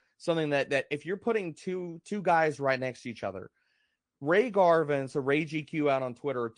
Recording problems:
garbled, watery; slightly; nothing above 9 kHz

